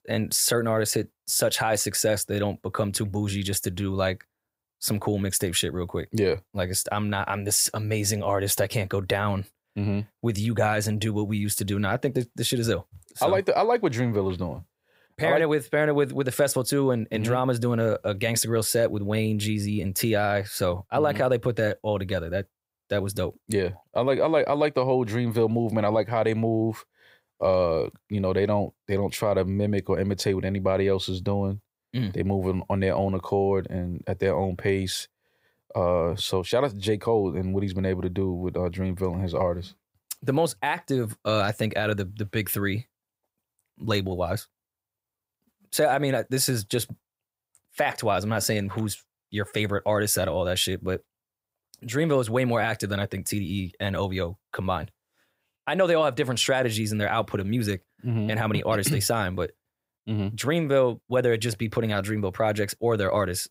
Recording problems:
none

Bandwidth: 15.5 kHz